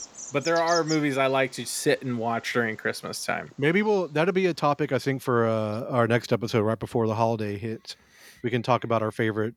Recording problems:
animal sounds; noticeable; throughout; 10 dB below the speech

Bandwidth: 19 kHz